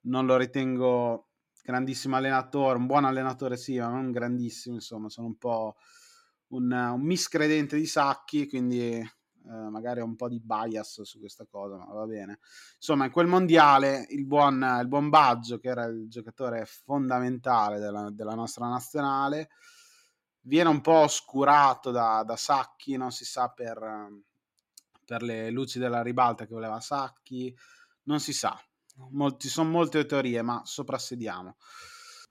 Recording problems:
none

